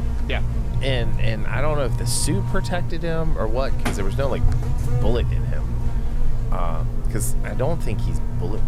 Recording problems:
electrical hum; loud; throughout; 50 Hz, 8 dB below the speech

